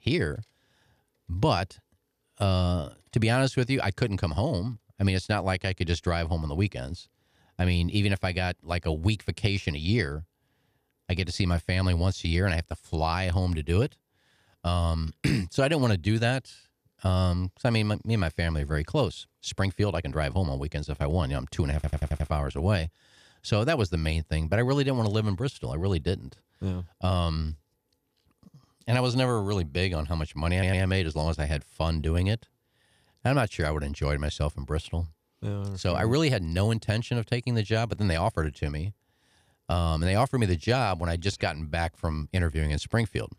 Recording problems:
audio stuttering; at 22 s and at 31 s

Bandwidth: 15 kHz